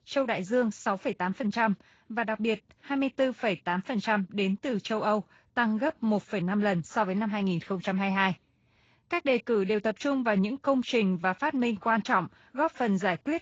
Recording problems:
garbled, watery; slightly; nothing above 7.5 kHz

